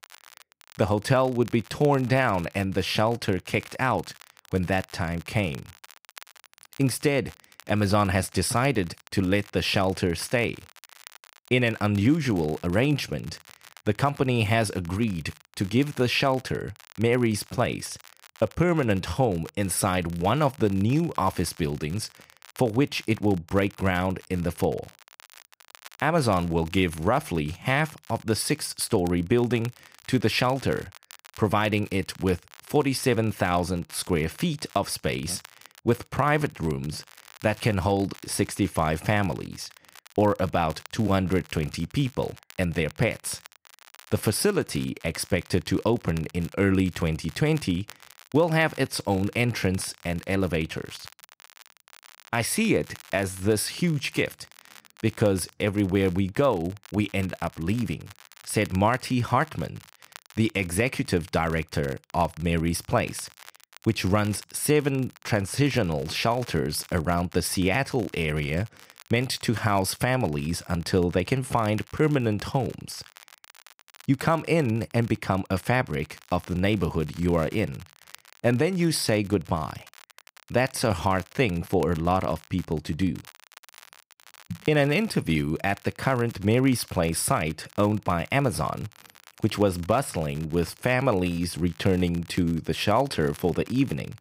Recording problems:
crackle, like an old record; faint; 25 dB below the speech

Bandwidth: 15.5 kHz